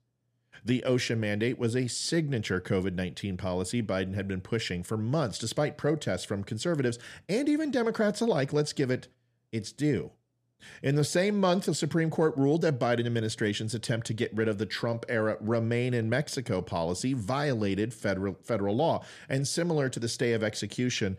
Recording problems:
none

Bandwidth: 14.5 kHz